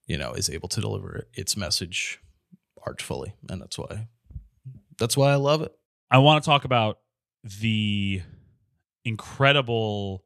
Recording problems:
none

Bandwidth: 14 kHz